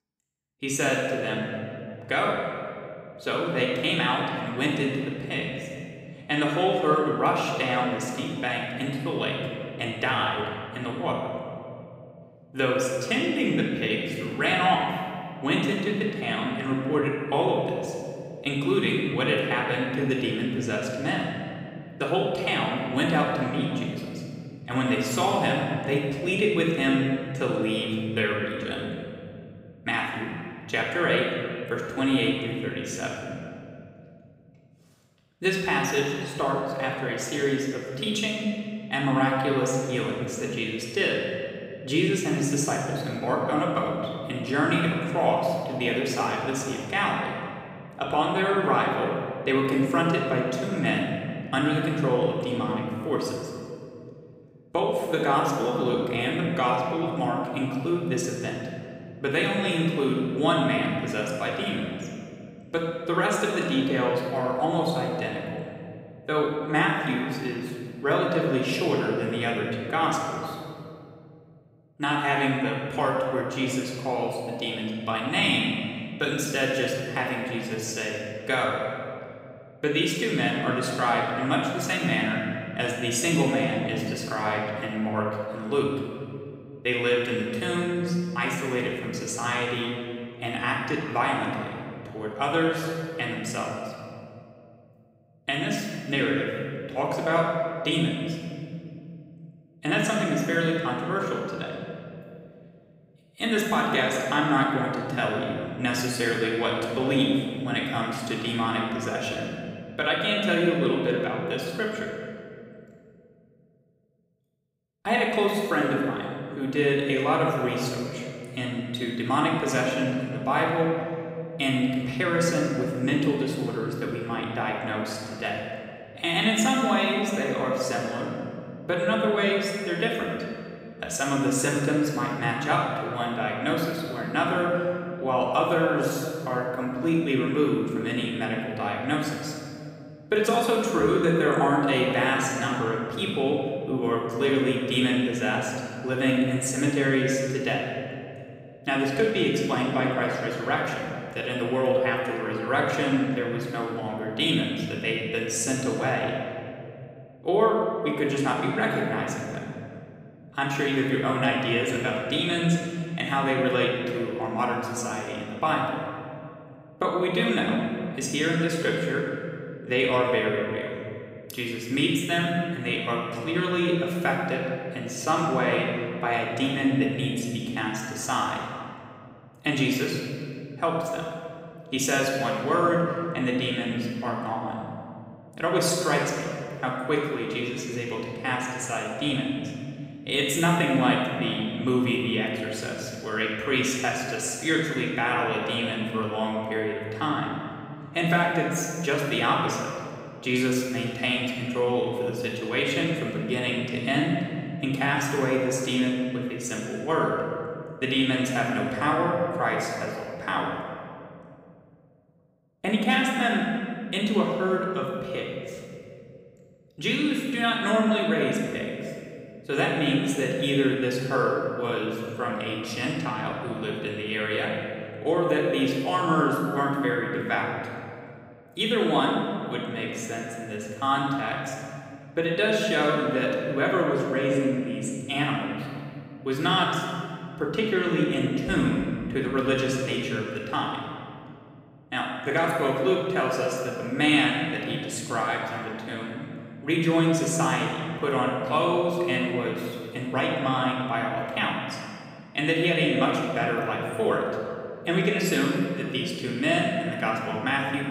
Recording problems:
off-mic speech; far
room echo; noticeable; dies away in 2.4 s

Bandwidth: 15.5 kHz